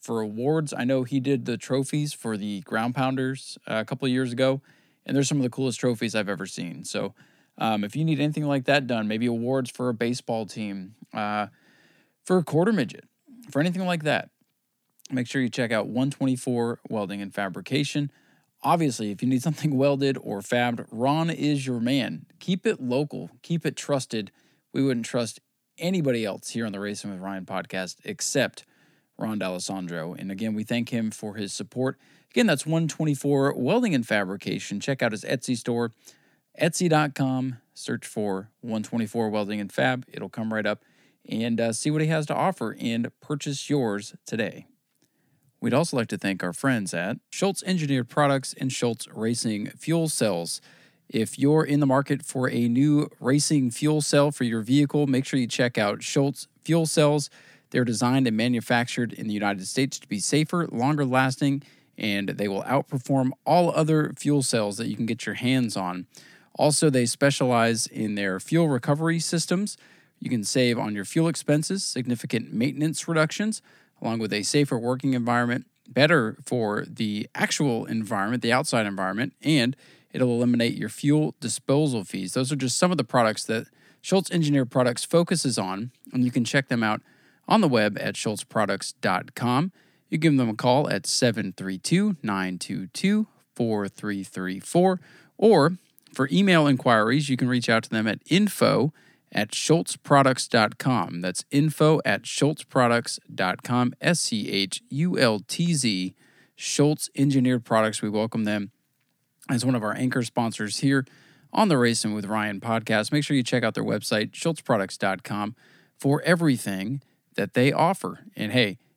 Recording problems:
none

